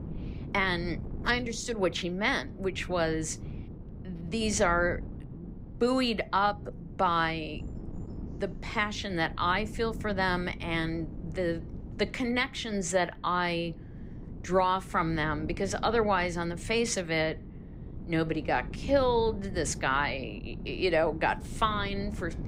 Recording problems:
wind noise on the microphone; occasional gusts; 20 dB below the speech

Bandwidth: 15.5 kHz